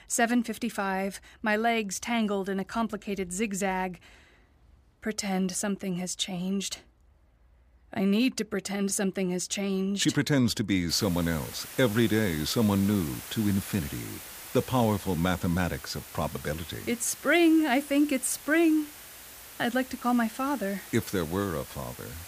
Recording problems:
hiss; noticeable; from 11 s on; 15 dB below the speech

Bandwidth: 15 kHz